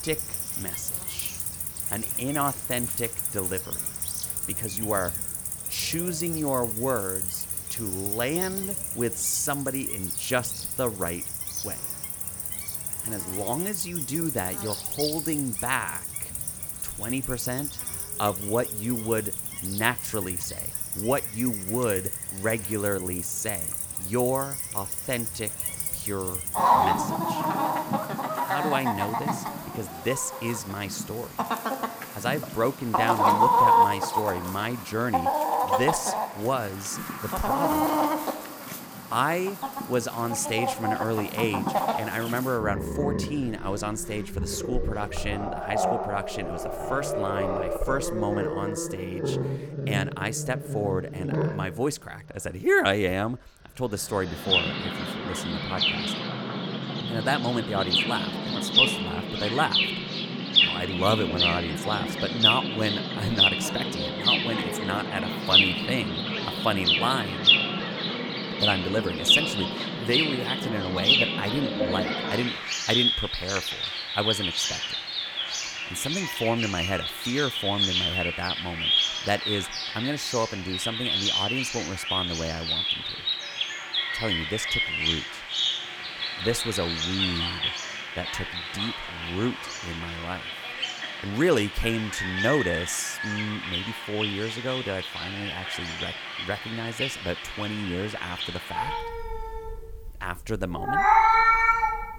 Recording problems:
animal sounds; very loud; throughout; 4 dB above the speech

